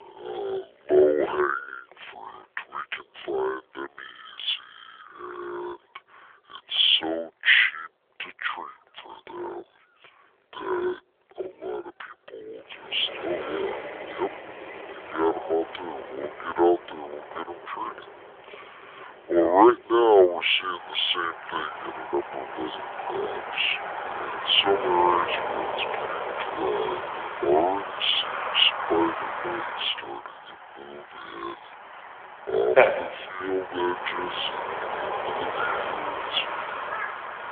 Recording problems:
wrong speed and pitch; too slow and too low; 0.6 times normal speed
phone-call audio; nothing above 3.5 kHz
animal sounds; loud; throughout; 1 dB below the speech
traffic noise; loud; from 13 s on; 9 dB below the speech

